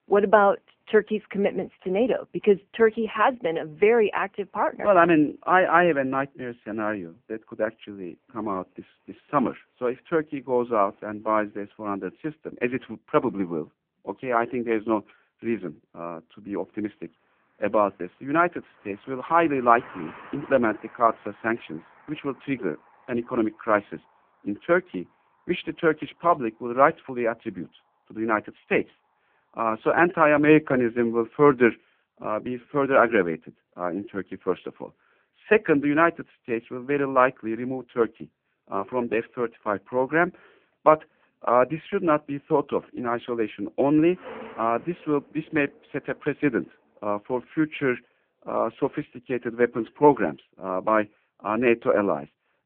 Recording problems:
phone-call audio; poor line
traffic noise; faint; throughout; 25 dB below the speech

